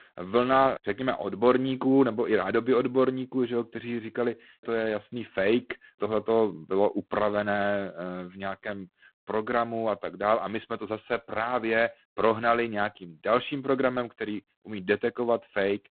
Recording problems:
phone-call audio; poor line; nothing above 4 kHz

